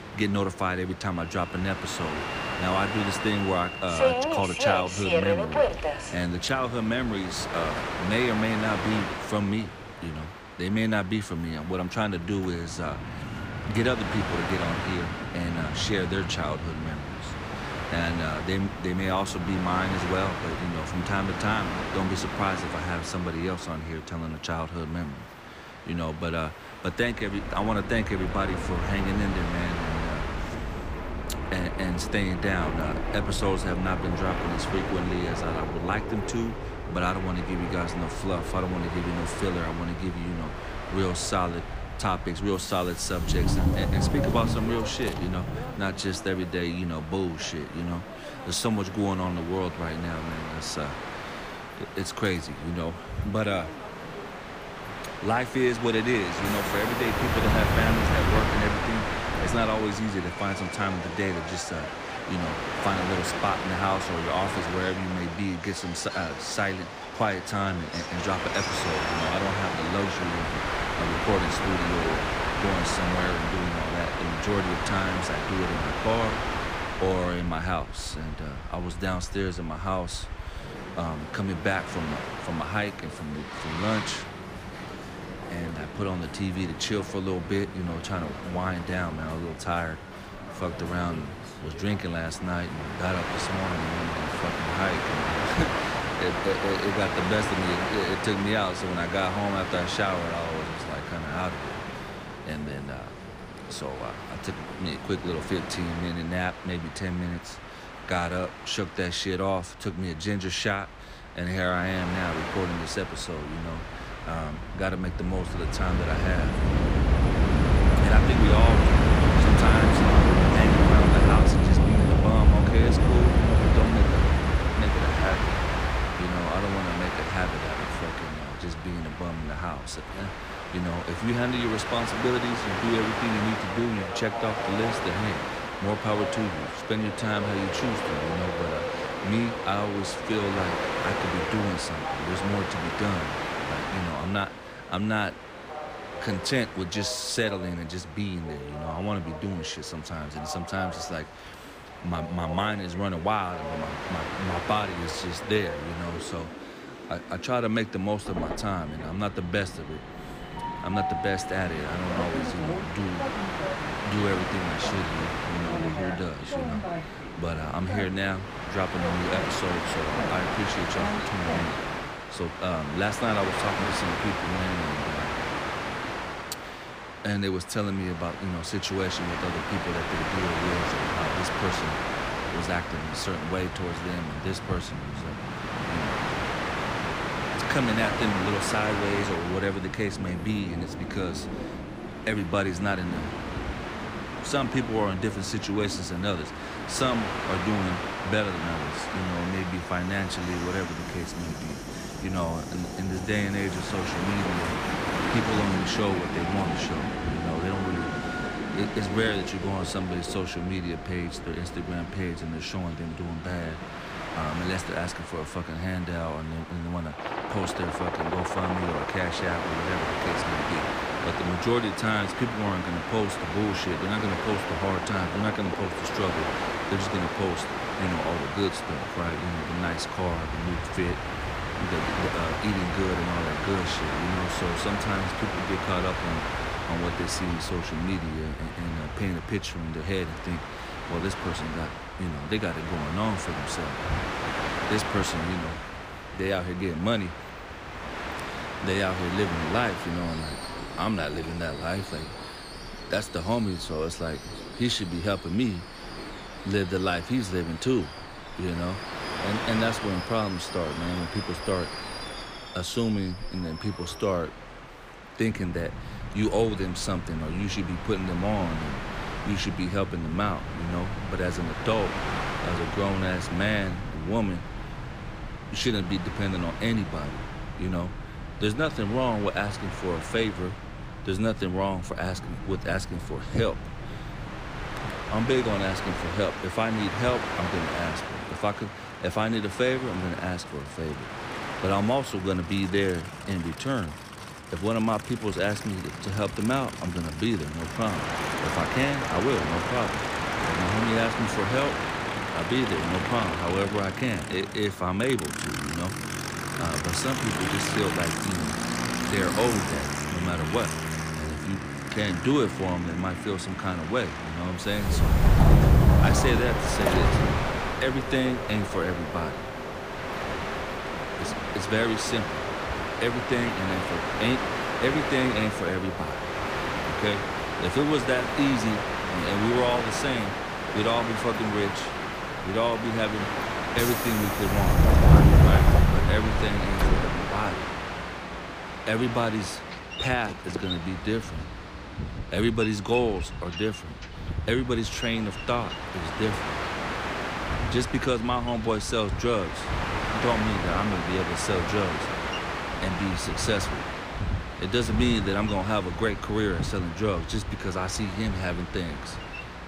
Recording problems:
train or aircraft noise; very loud; throughout; as loud as the speech

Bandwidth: 15 kHz